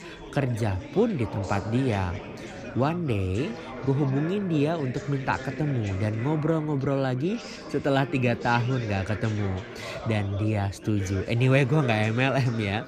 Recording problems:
background chatter; noticeable; throughout; 4 voices, 10 dB below the speech

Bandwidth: 15 kHz